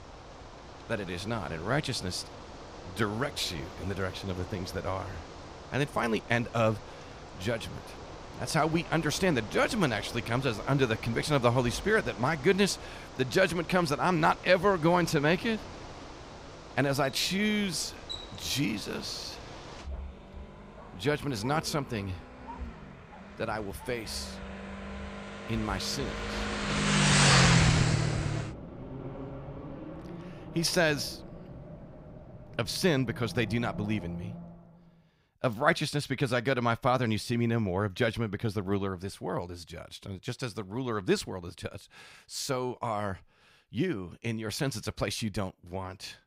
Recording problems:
traffic noise; loud; until 34 s; 3 dB below the speech

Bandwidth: 15.5 kHz